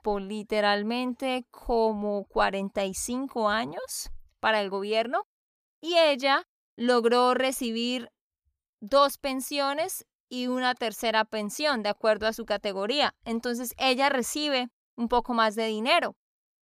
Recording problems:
none

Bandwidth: 15 kHz